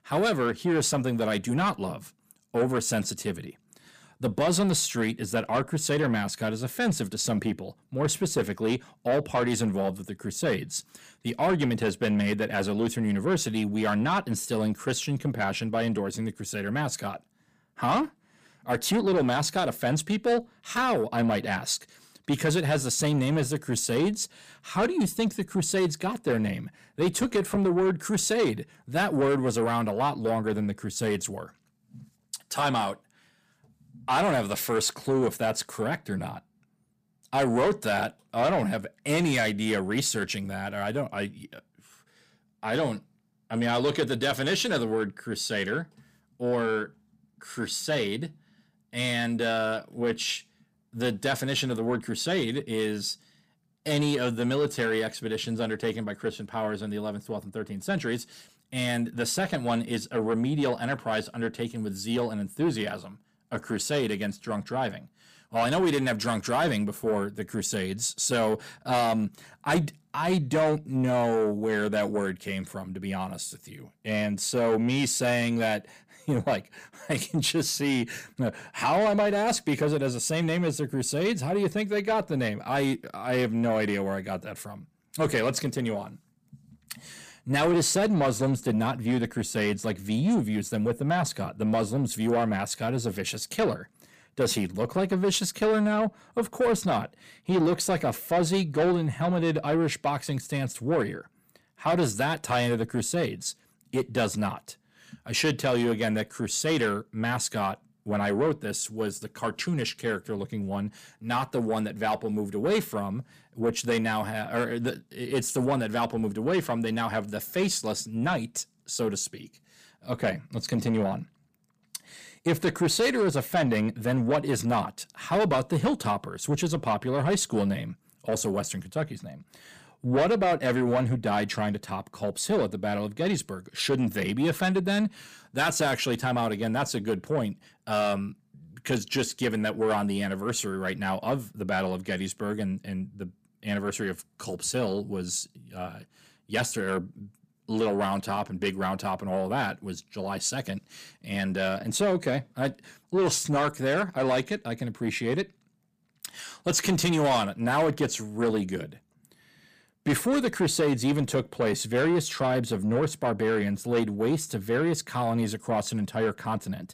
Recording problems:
distortion; slight; 10 dB below the speech

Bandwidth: 15 kHz